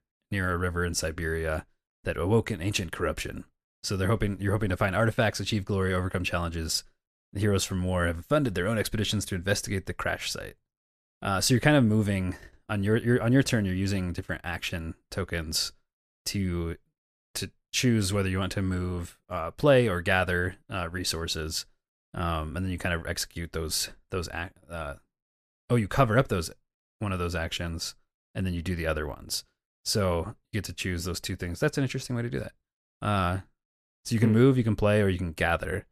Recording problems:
none

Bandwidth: 14.5 kHz